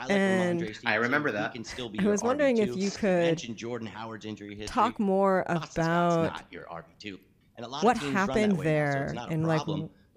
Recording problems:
voice in the background; noticeable; throughout; 10 dB below the speech

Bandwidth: 15 kHz